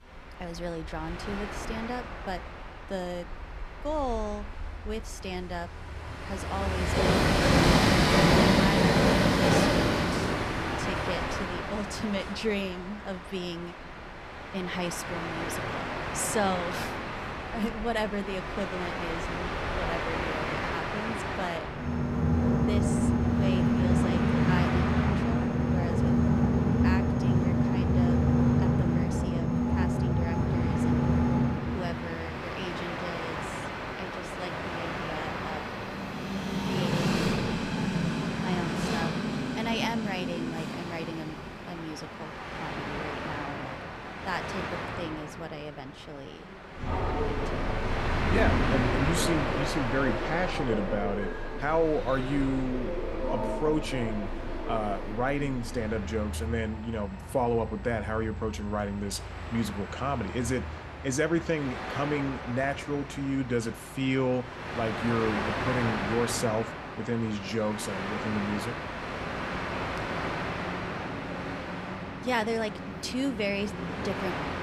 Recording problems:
train or aircraft noise; very loud; throughout; 4 dB above the speech
dog barking; faint; at 1:11; peak 15 dB below the speech

